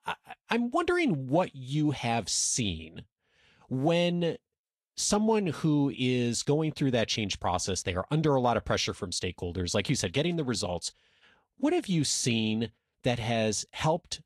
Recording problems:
garbled, watery; slightly

